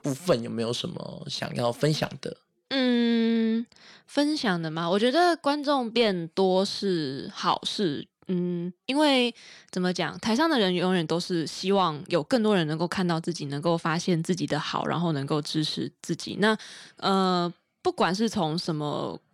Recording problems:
none

